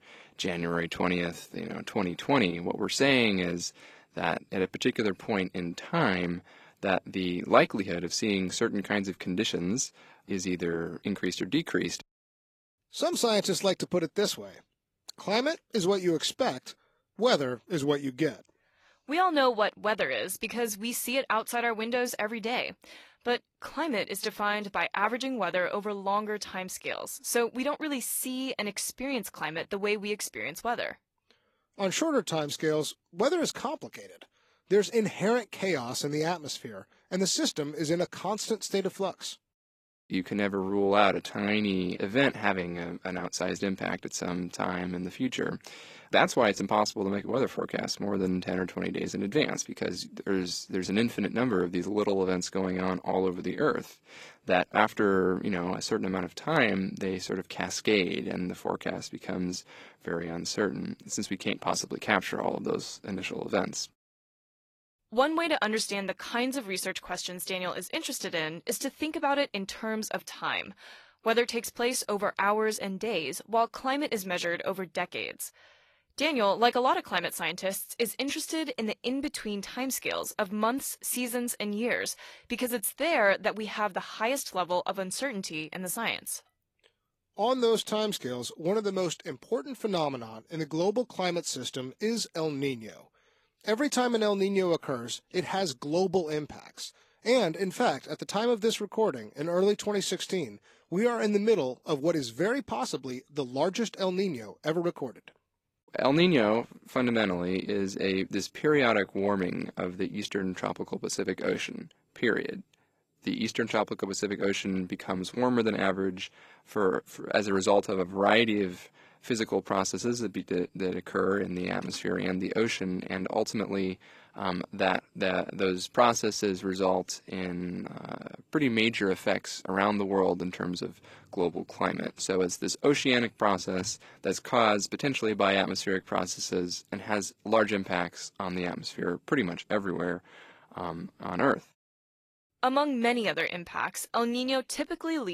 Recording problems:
garbled, watery; slightly; nothing above 13.5 kHz
abrupt cut into speech; at the end

